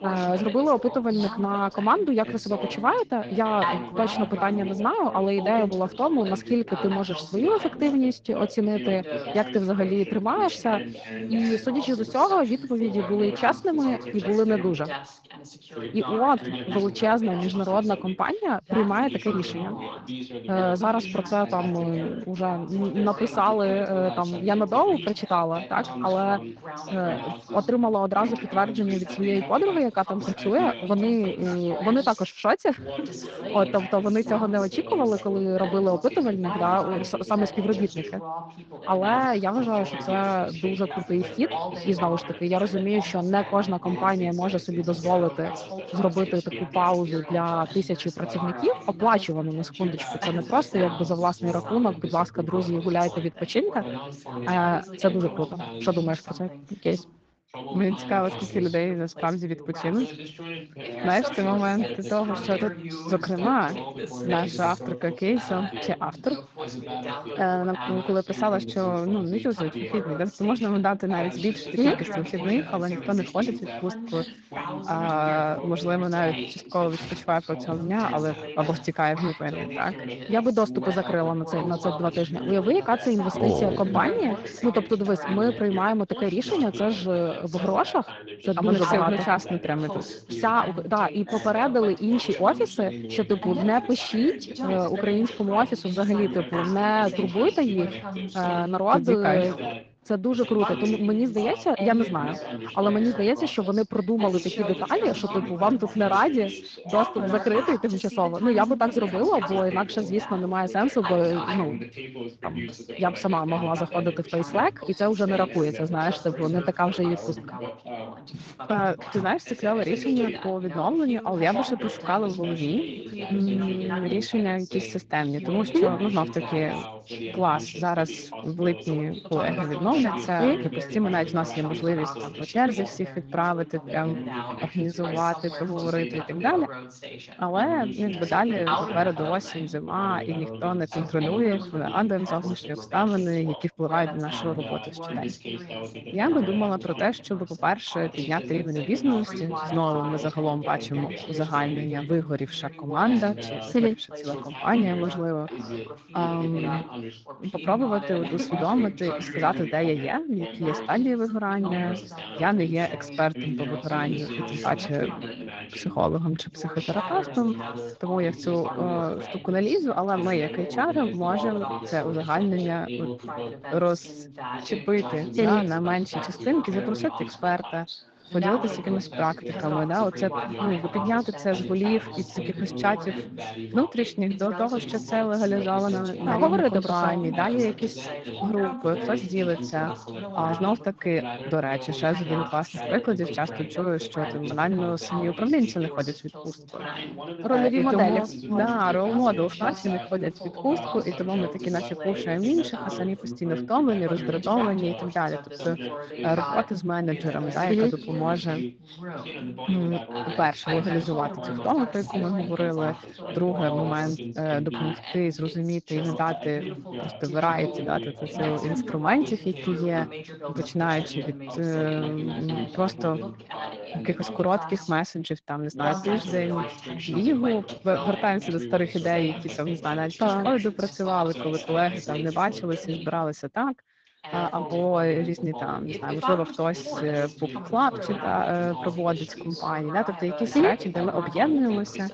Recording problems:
garbled, watery; slightly
background chatter; loud; throughout; 2 voices, 9 dB below the speech

